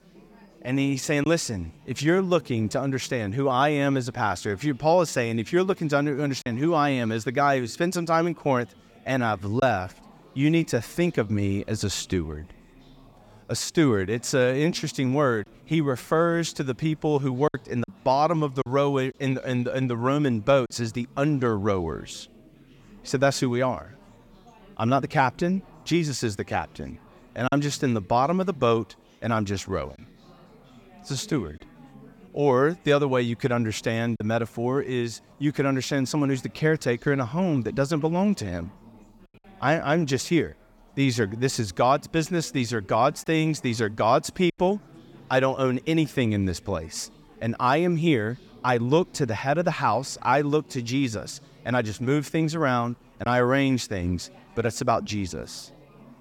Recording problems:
chatter from many people; faint; throughout; 25 dB below the speech
choppy; occasionally; 1% of the speech affected

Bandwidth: 17.5 kHz